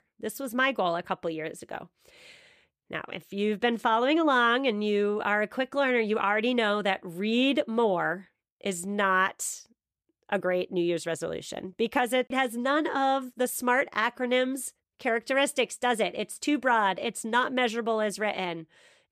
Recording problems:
none

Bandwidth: 14.5 kHz